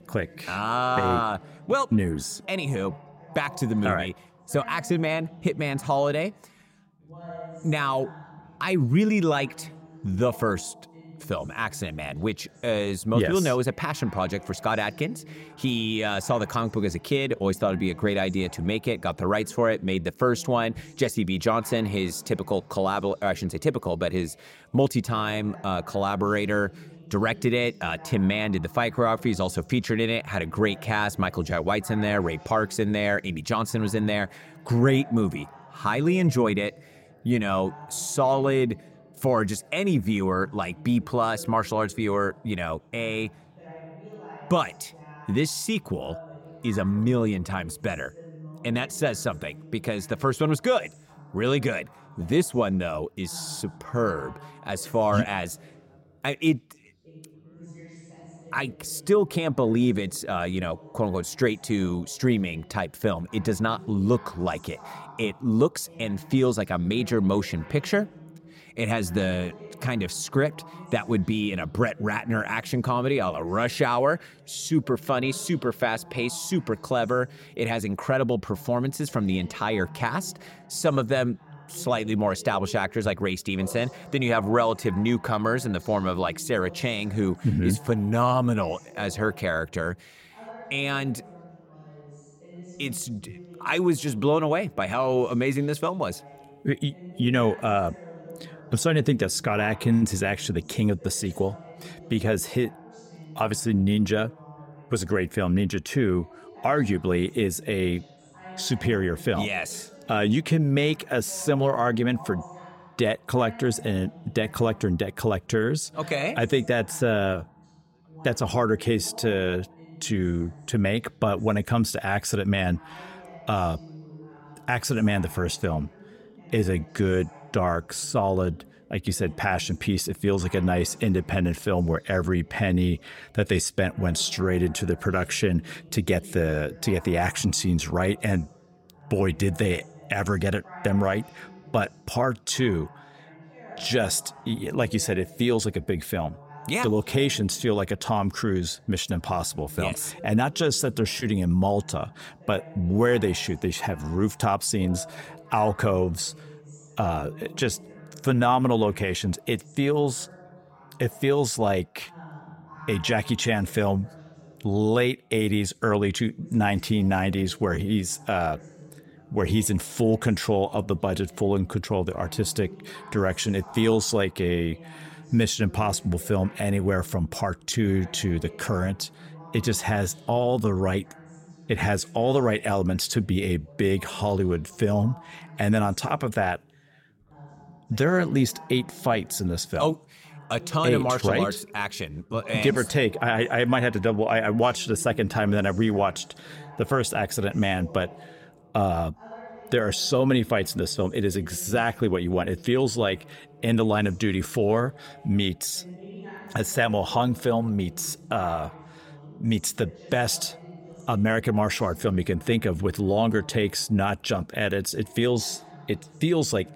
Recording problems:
background chatter; faint; throughout; 3 voices, 20 dB below the speech

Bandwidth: 16.5 kHz